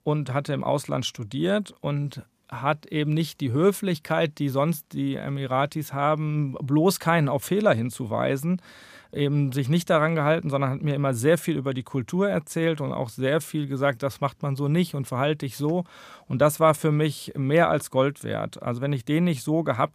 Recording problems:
none

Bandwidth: 15 kHz